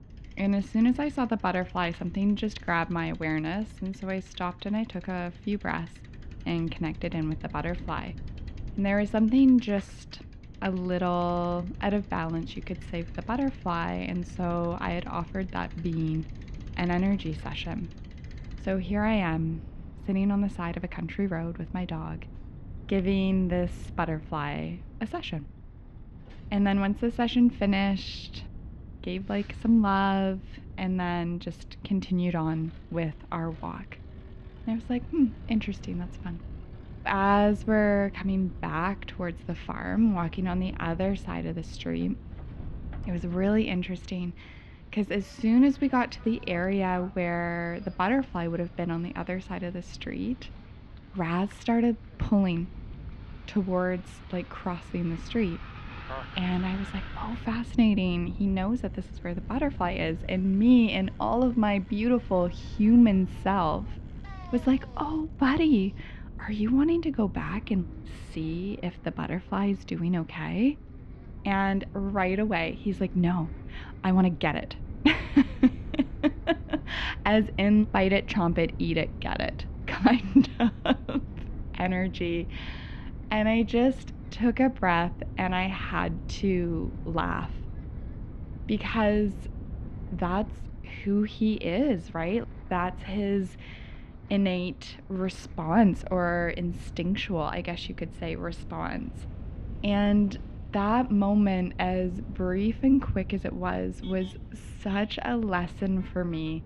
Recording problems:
muffled; slightly; fading above 3.5 kHz
wind noise on the microphone; occasional gusts; 25 dB below the speech
traffic noise; faint; throughout; 25 dB below the speech

